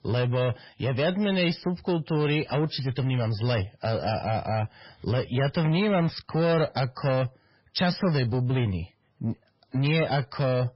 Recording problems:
garbled, watery; badly; nothing above 5.5 kHz
distortion; slight; 10 dB below the speech

